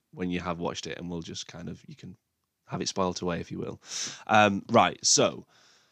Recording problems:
none

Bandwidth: 15 kHz